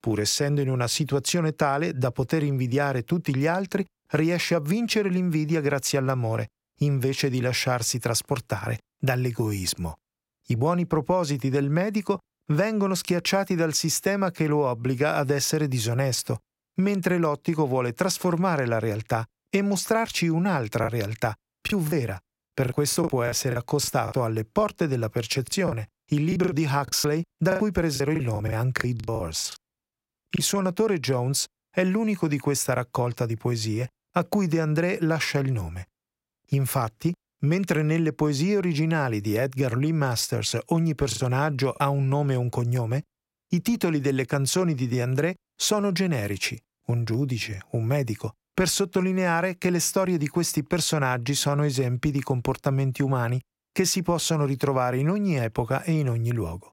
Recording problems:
choppy; very; from 21 to 24 s, from 25 to 30 s and at 41 s; 14% of the speech affected

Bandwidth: 16 kHz